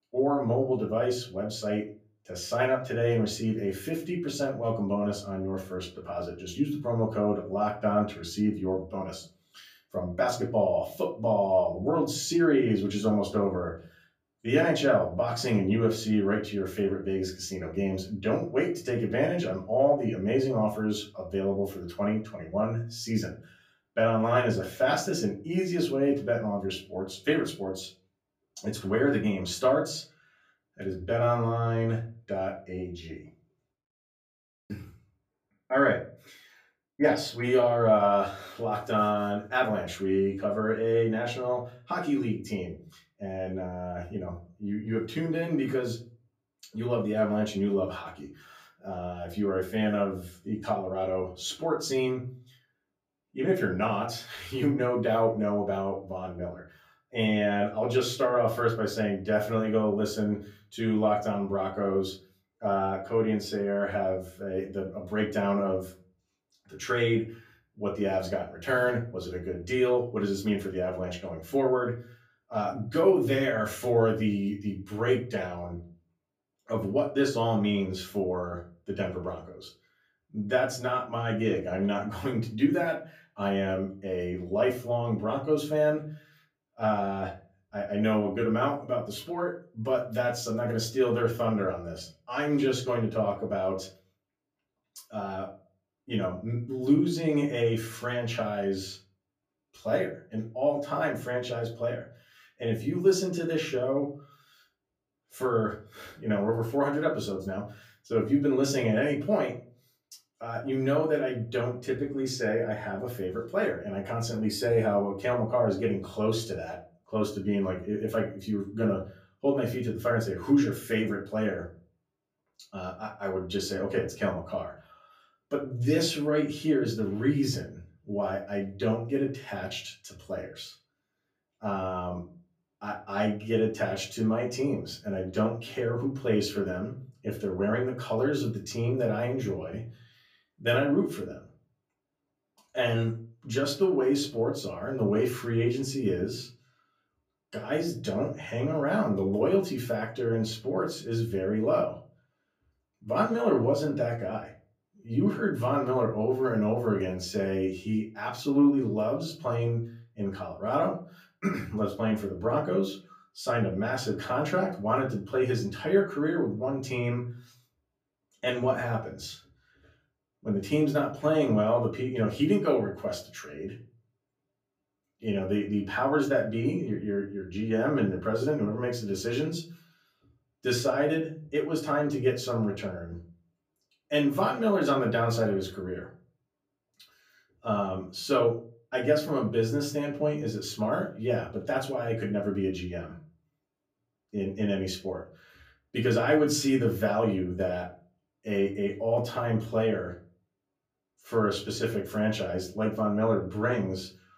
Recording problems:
off-mic speech; far
room echo; very slight; dies away in 0.3 s

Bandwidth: 15 kHz